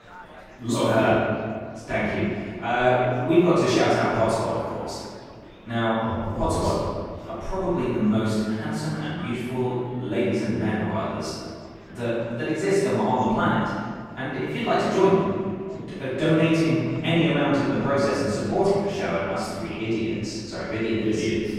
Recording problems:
room echo; strong; dies away in 1.7 s
off-mic speech; far
murmuring crowd; faint; throughout; 25 dB below the speech

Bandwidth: 16 kHz